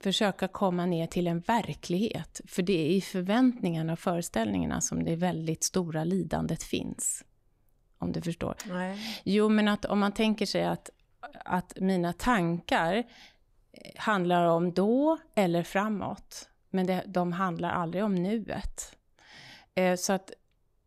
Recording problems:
none

